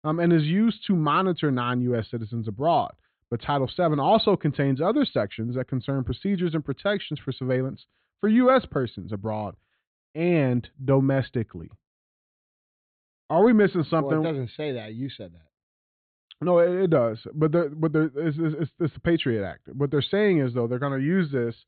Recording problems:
high frequencies cut off; severe; nothing above 4 kHz

